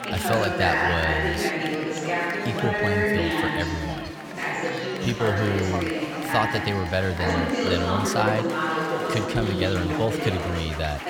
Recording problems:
chatter from many people; very loud; throughout; 2 dB above the speech

